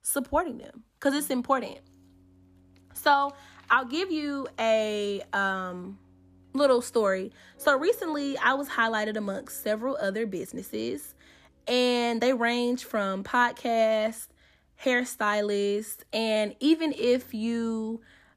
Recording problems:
background music; faint; throughout; 30 dB below the speech

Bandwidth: 14.5 kHz